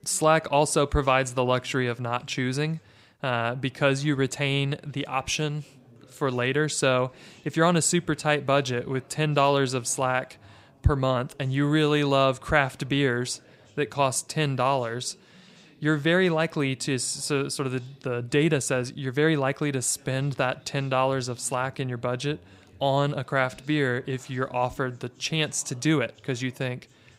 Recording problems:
background chatter; faint; throughout; 4 voices, 30 dB below the speech

